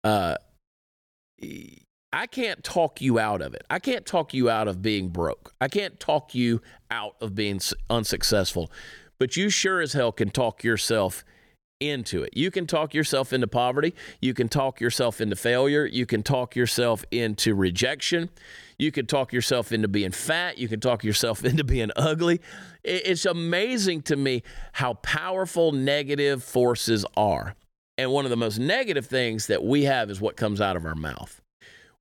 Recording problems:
none

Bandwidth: 18 kHz